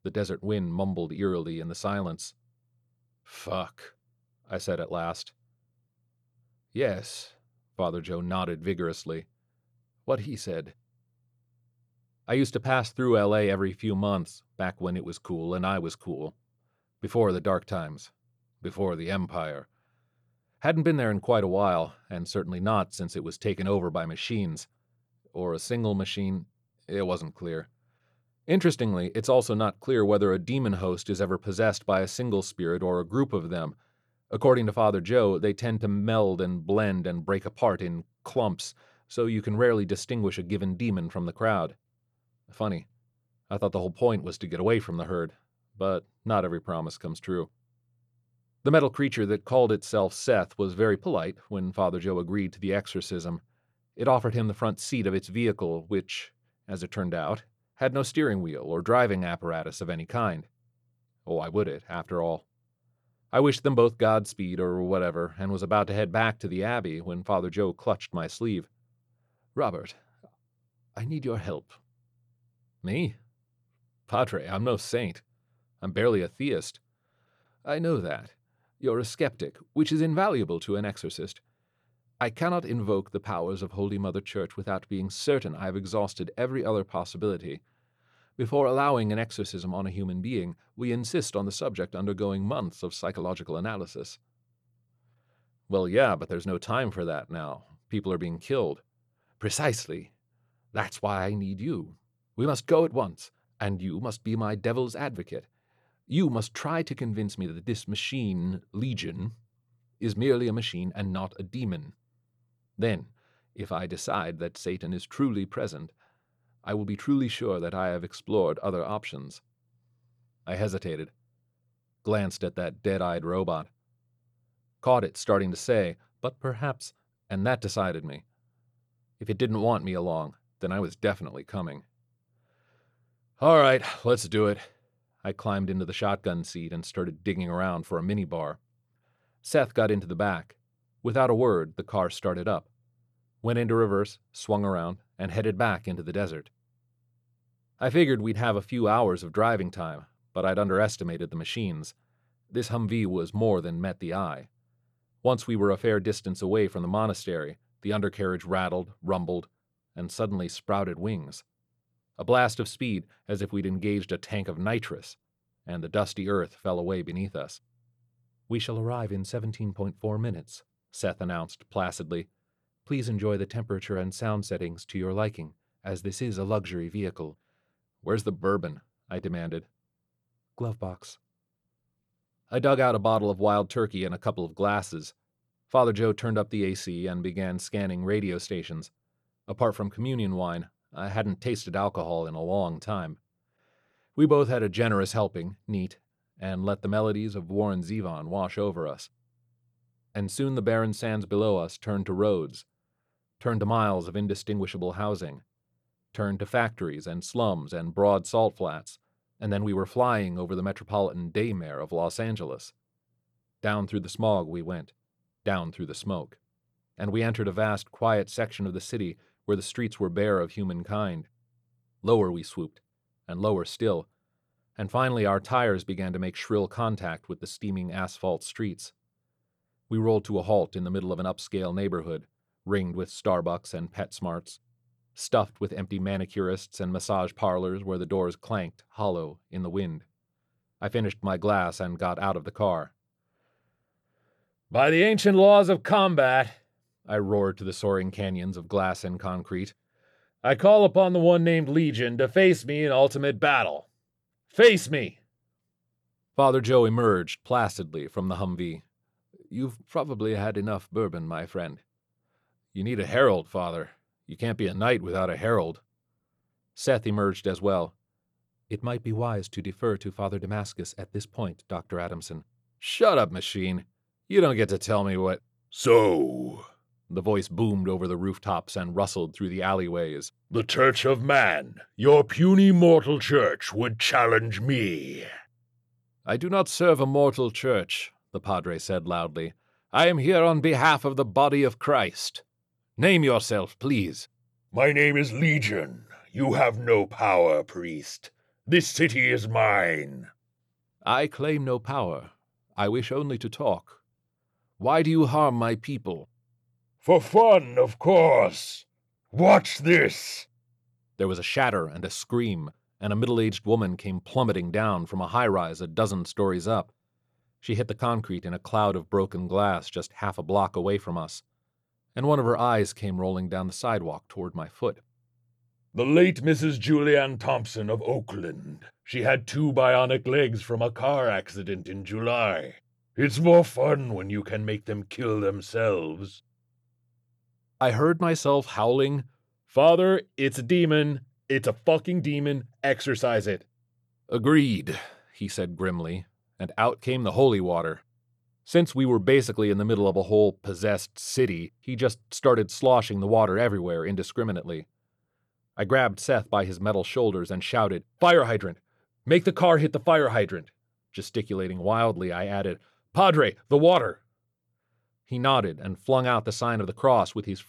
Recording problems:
none

